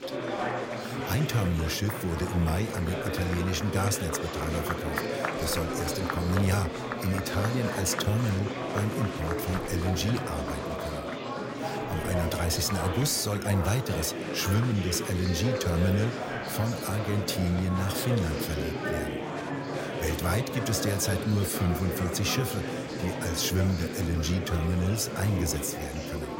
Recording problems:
murmuring crowd; loud; throughout; 3 dB below the speech

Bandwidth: 16 kHz